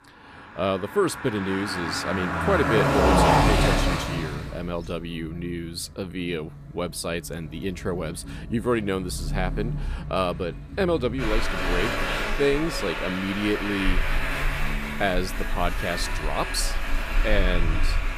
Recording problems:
traffic noise; very loud; throughout; 1 dB above the speech

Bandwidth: 14.5 kHz